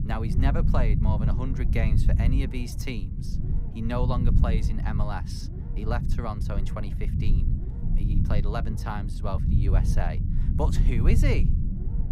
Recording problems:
low rumble; loud; throughout; 5 dB below the speech

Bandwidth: 15.5 kHz